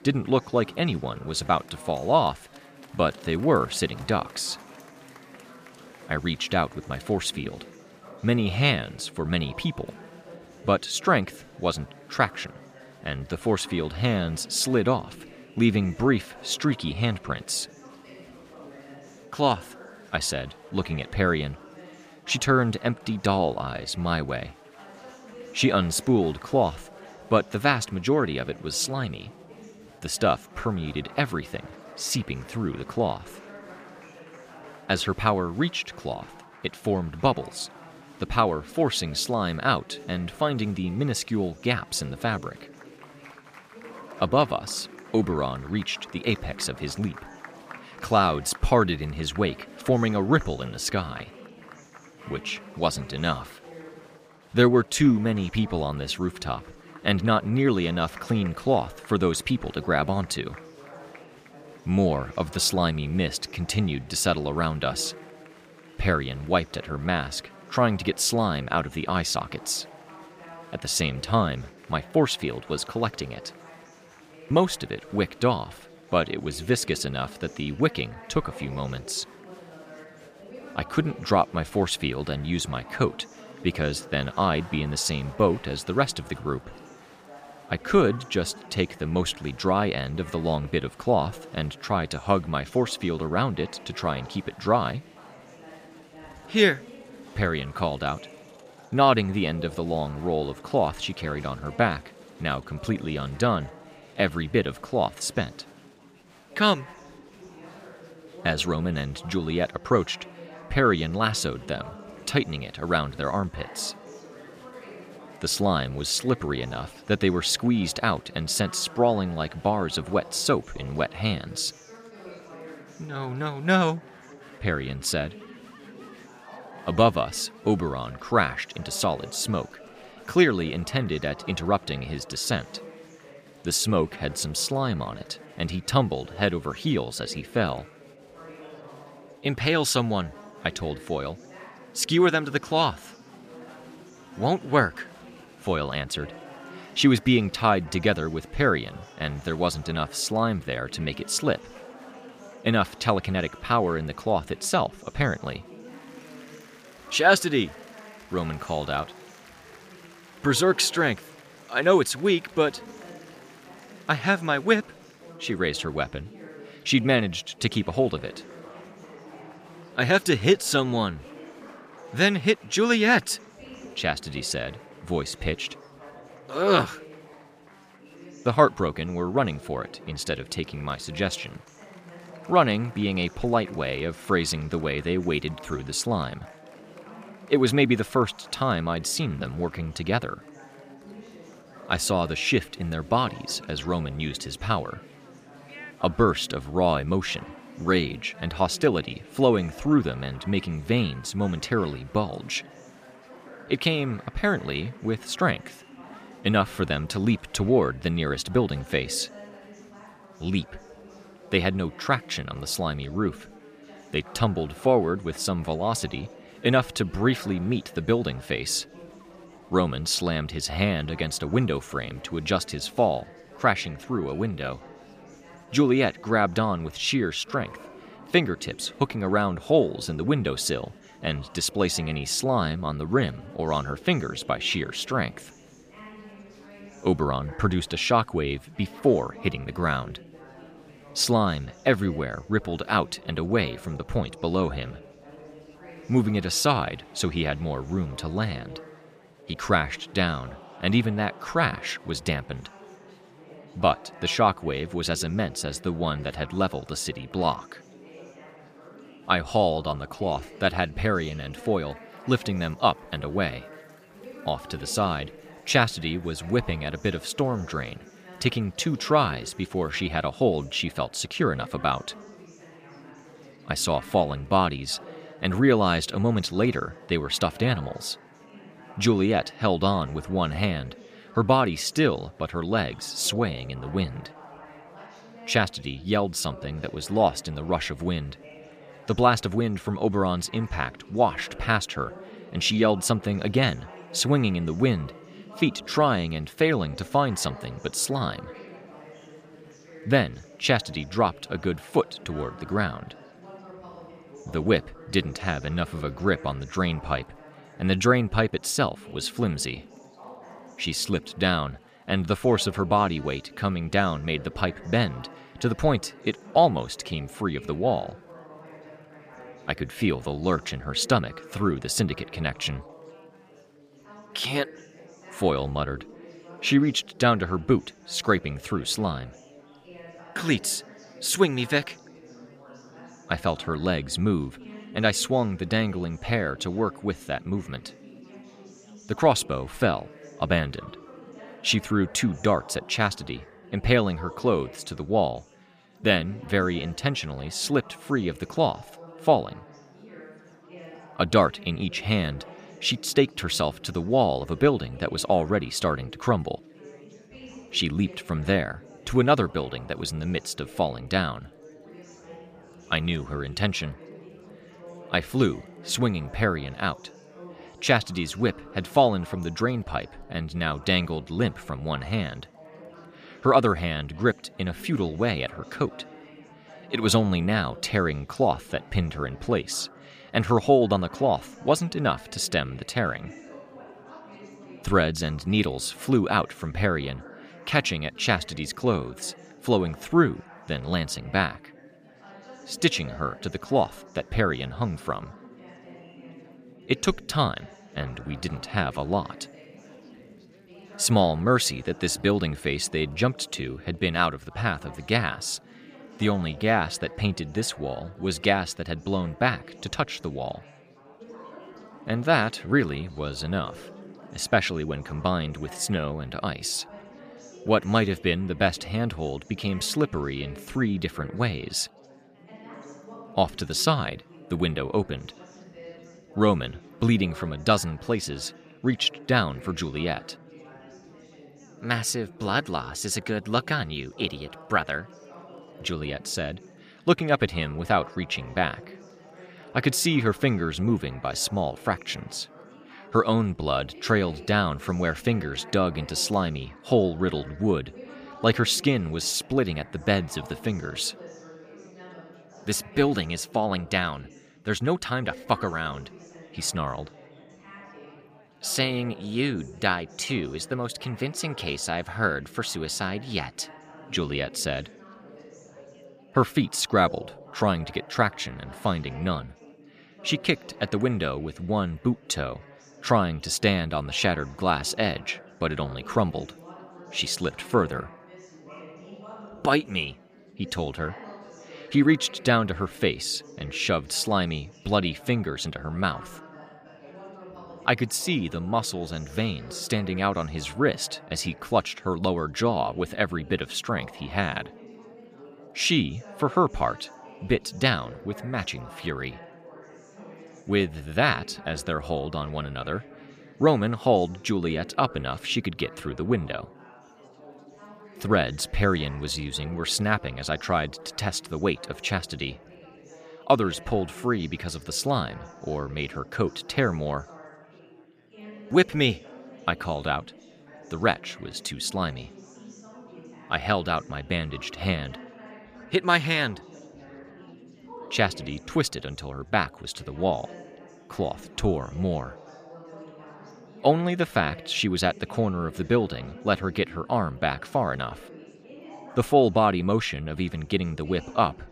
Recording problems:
chatter from many people; faint; throughout; 20 dB below the speech

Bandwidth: 15 kHz